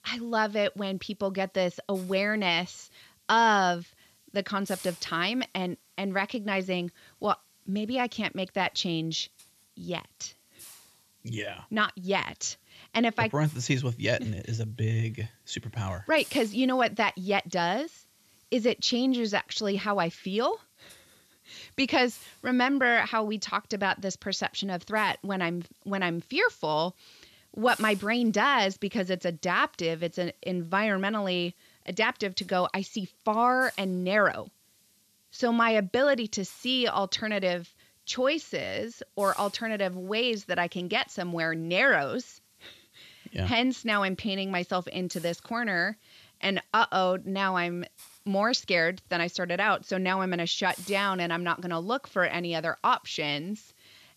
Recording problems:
high frequencies cut off; noticeable; nothing above 8 kHz
hiss; faint; throughout; 25 dB below the speech

